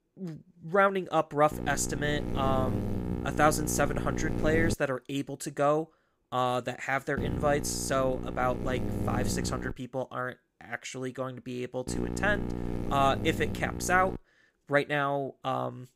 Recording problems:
electrical hum; noticeable; from 1.5 to 4.5 s, from 7 to 9.5 s and from 12 to 14 s; 60 Hz, 10 dB below the speech

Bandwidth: 15.5 kHz